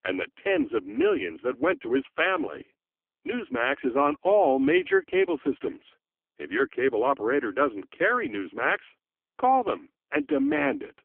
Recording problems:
phone-call audio; poor line; nothing above 3 kHz

